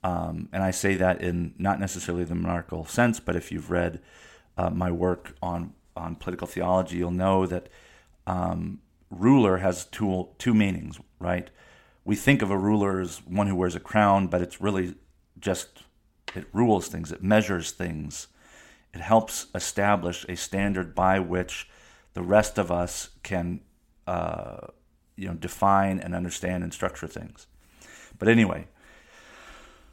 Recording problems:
none

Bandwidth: 16.5 kHz